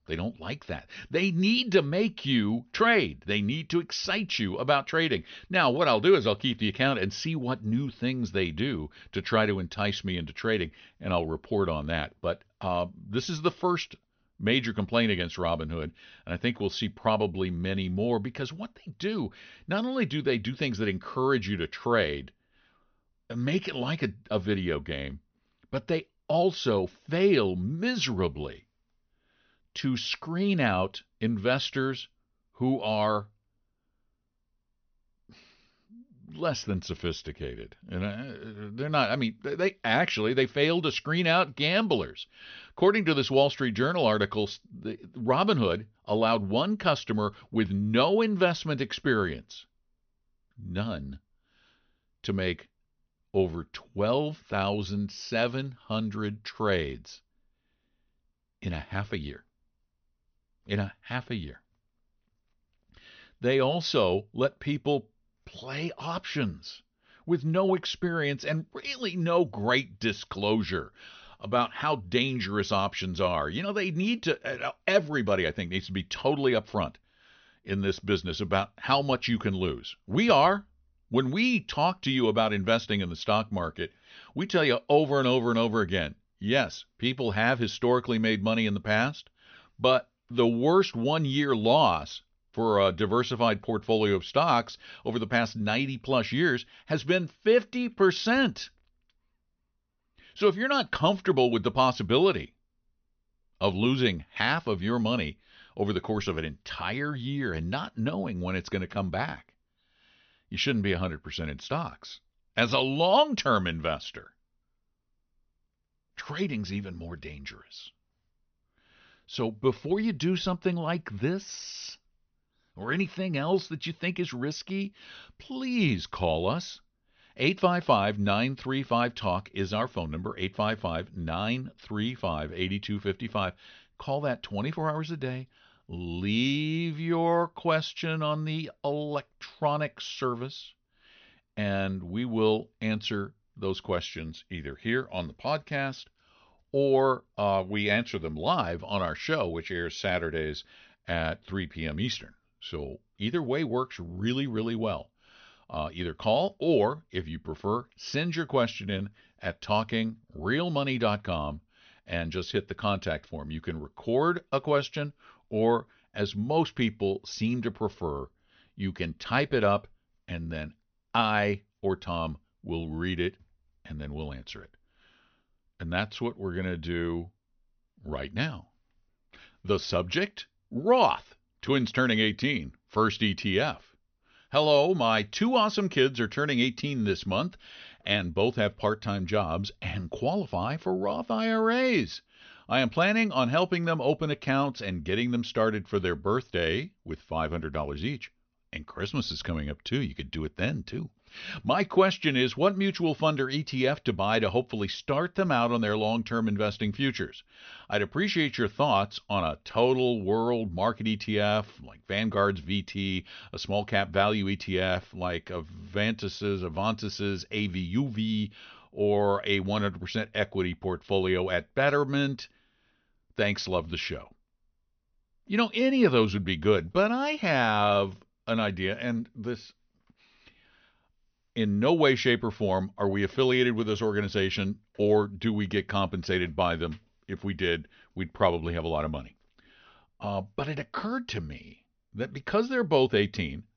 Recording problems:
high frequencies cut off; noticeable; nothing above 6 kHz

